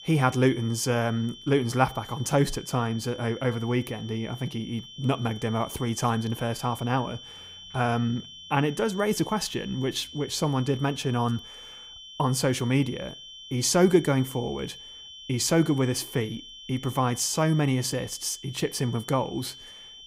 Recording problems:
high-pitched whine; noticeable; throughout; 3 kHz, 15 dB below the speech

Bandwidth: 15.5 kHz